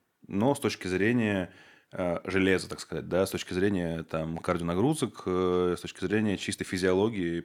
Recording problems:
uneven, jittery; strongly; from 1 to 6.5 s

